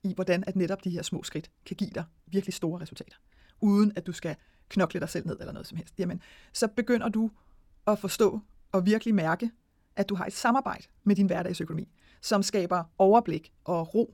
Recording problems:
wrong speed, natural pitch; too fast; 1.5 times normal speed

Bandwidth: 17.5 kHz